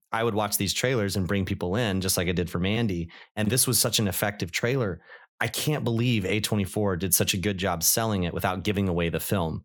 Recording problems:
none

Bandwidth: 19 kHz